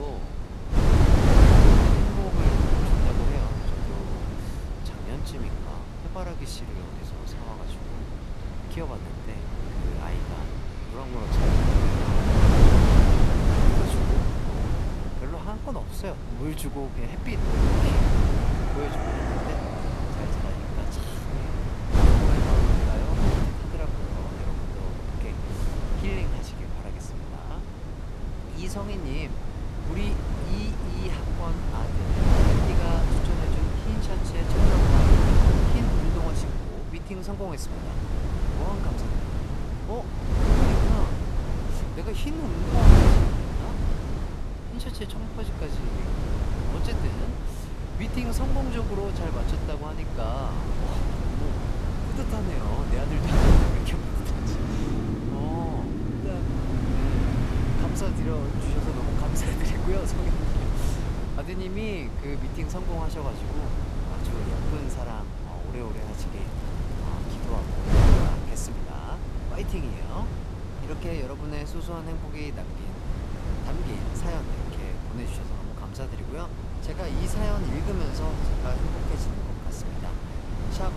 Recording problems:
traffic noise; very loud; throughout; as loud as the speech
wind noise on the microphone; heavy; 5 dB above the speech
high-pitched whine; faint; throughout; 3.5 kHz, 30 dB below the speech
crackling; faint; from 1:06 to 1:09; 20 dB below the speech
abrupt cut into speech; at the start

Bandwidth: 13.5 kHz